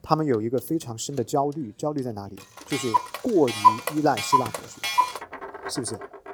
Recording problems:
household noises; very loud; throughout; 2 dB above the speech

